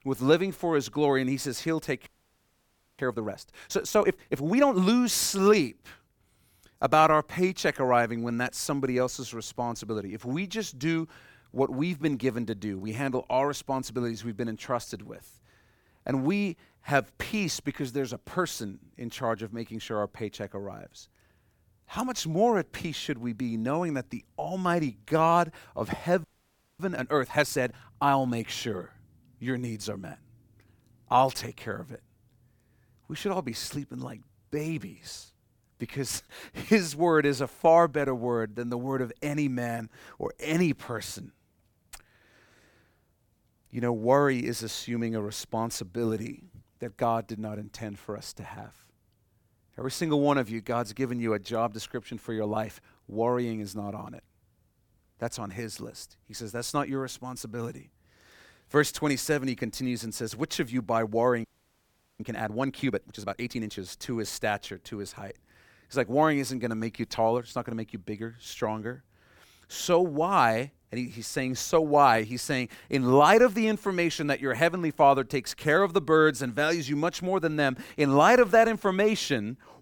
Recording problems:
audio freezing; at 2 s for 1 s, at 26 s for 0.5 s and at 1:01 for 1 s

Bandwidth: 18 kHz